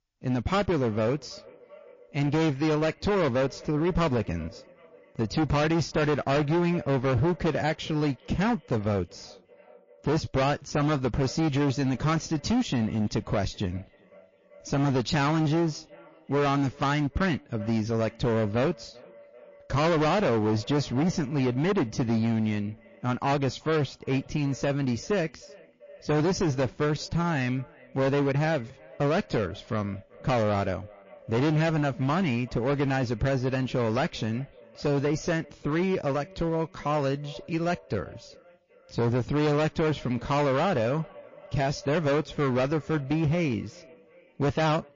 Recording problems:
distortion; heavy; 16% of the sound clipped
echo of what is said; faint; throughout; 390 ms later, 25 dB below the speech
garbled, watery; slightly; nothing above 7 kHz

